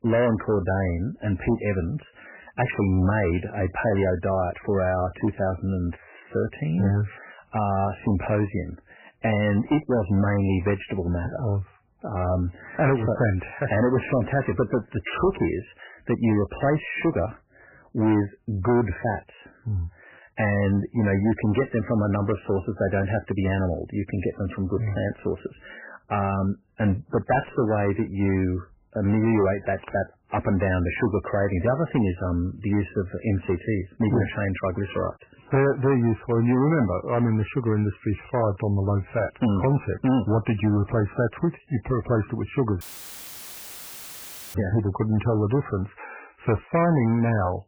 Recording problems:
garbled, watery; badly; nothing above 3 kHz
distortion; slight; 8% of the sound clipped
audio cutting out; filled with static; at 43 s for 1.5 s

